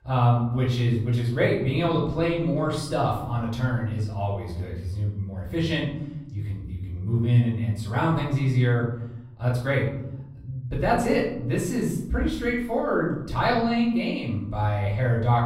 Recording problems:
off-mic speech; far
room echo; noticeable; dies away in 1 s

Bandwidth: 16 kHz